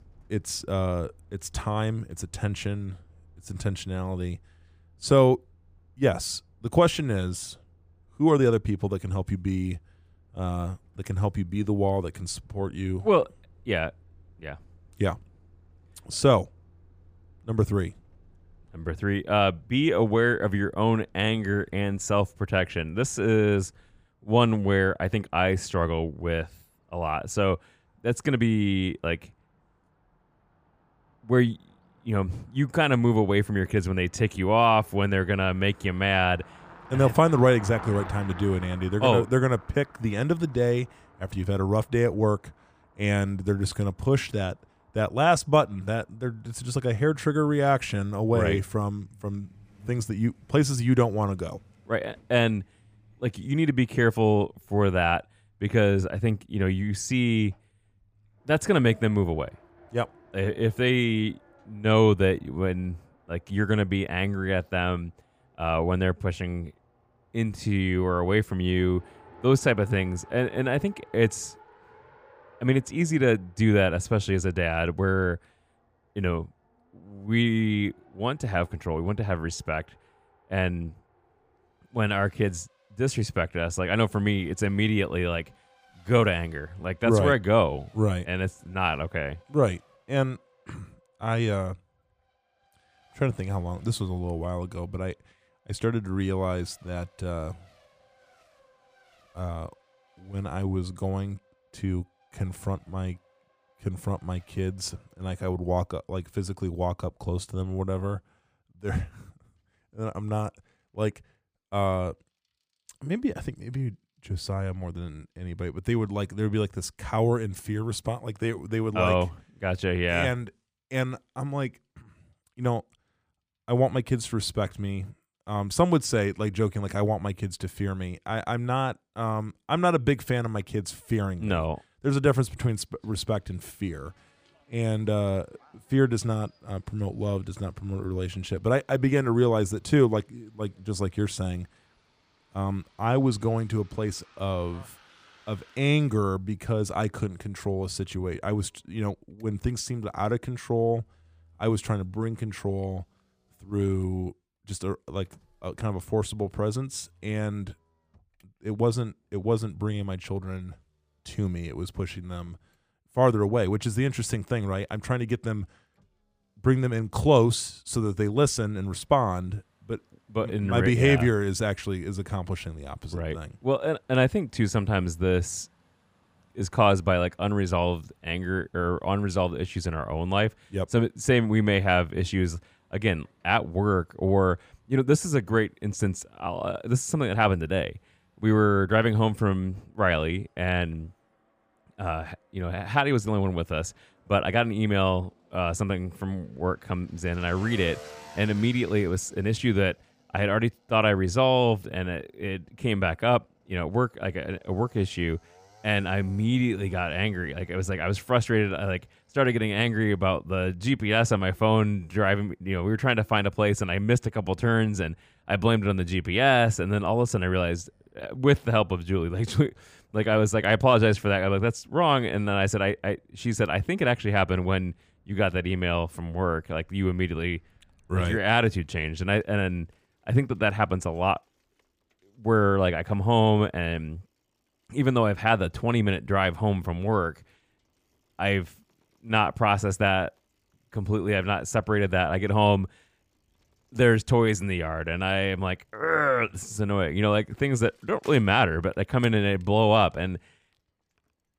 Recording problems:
traffic noise; faint; throughout; 30 dB below the speech

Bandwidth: 15 kHz